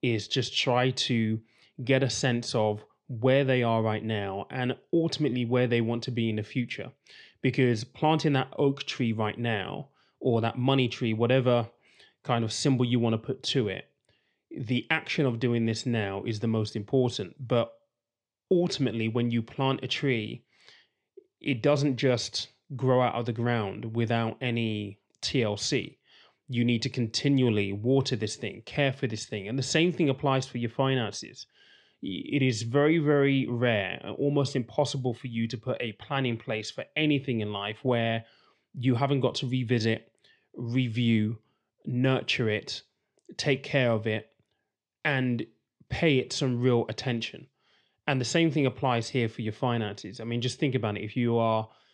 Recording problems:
none

